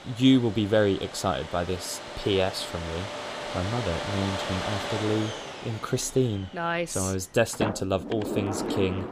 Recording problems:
household noises; loud; throughout; 7 dB below the speech

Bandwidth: 15 kHz